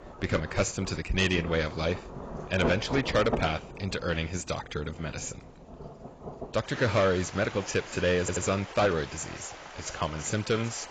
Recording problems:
garbled, watery; badly; nothing above 7.5 kHz
distortion; slight; 3% of the sound clipped
rain or running water; noticeable; throughout; 10 dB below the speech
audio stuttering; at 8 s

